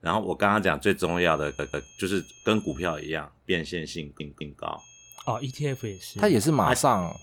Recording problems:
high-pitched whine; faint; from 1 to 3 s and from 5 s on; 6.5 kHz, 25 dB below the speech
audio stuttering; at 1.5 s and at 4 s

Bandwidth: 18.5 kHz